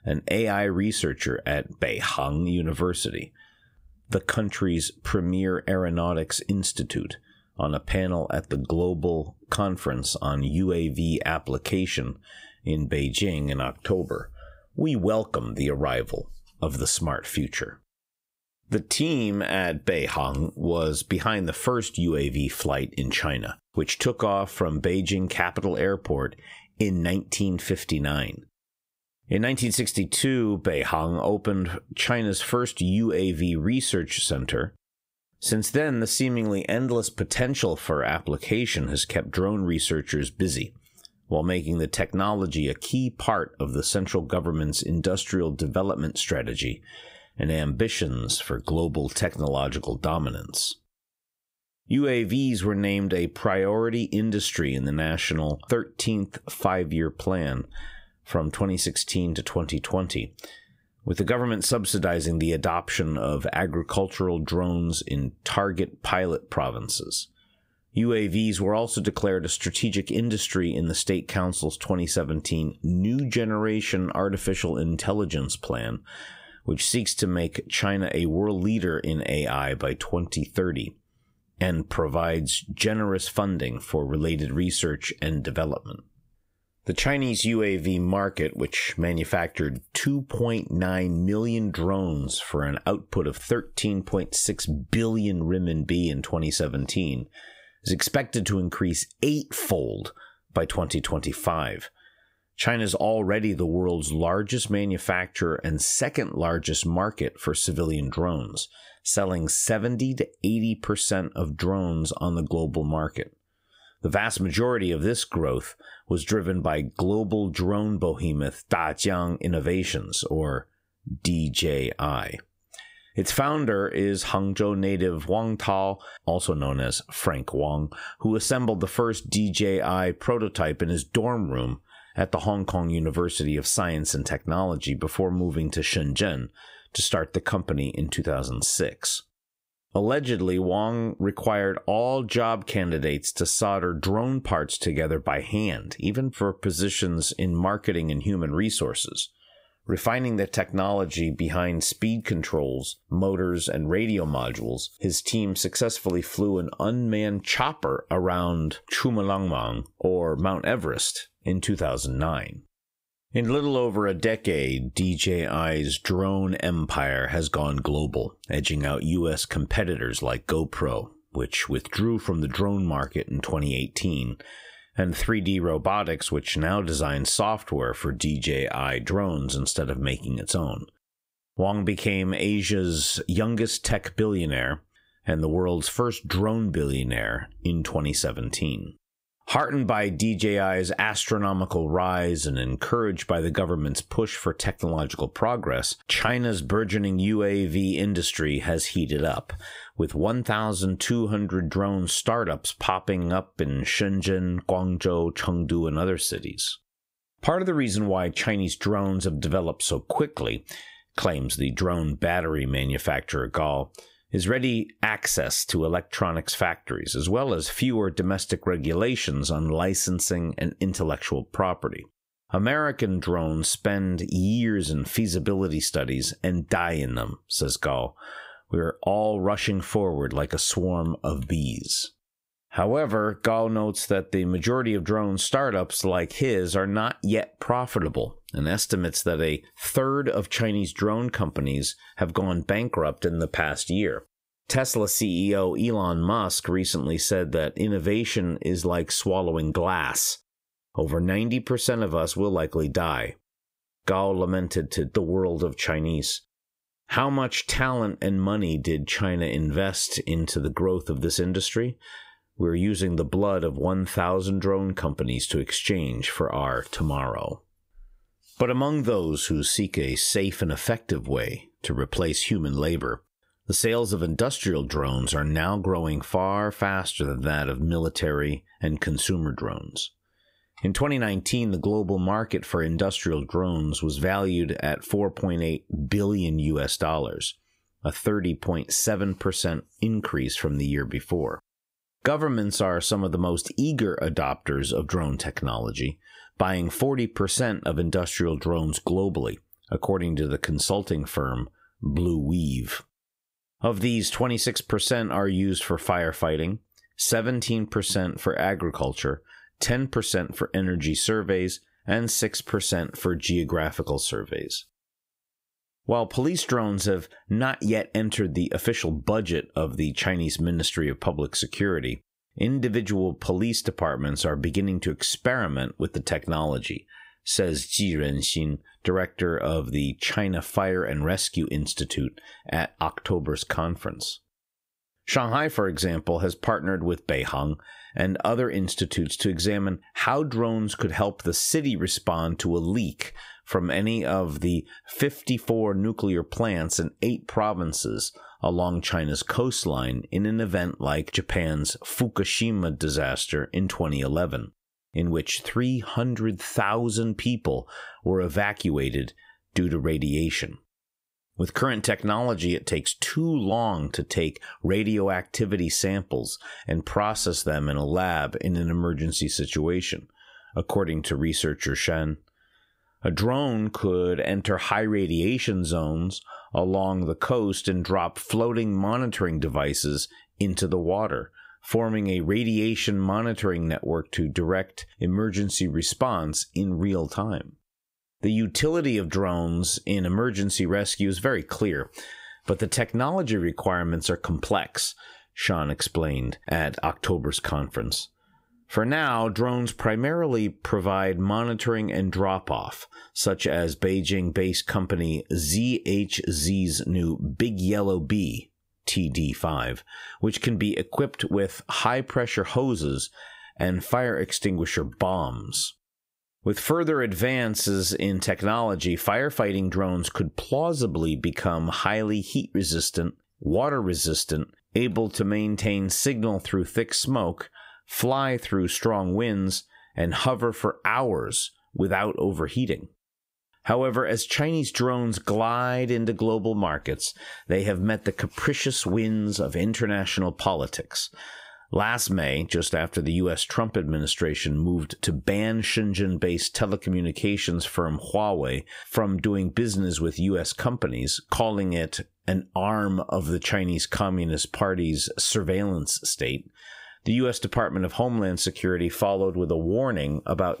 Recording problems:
squashed, flat; heavily

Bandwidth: 15.5 kHz